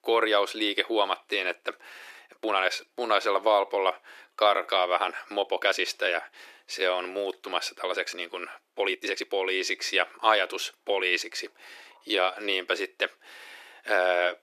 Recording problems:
thin; very; fading below 350 Hz
uneven, jittery; strongly; from 2 to 12 s

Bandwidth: 14 kHz